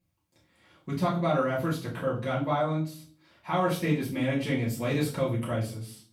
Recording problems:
off-mic speech; far
room echo; noticeable; dies away in 0.4 s

